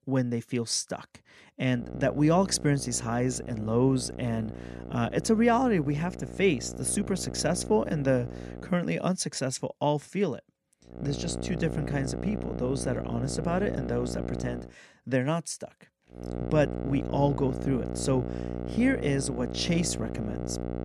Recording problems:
electrical hum; noticeable; from 2 to 8.5 s, from 11 to 15 s and from 16 s on; 60 Hz, 10 dB below the speech

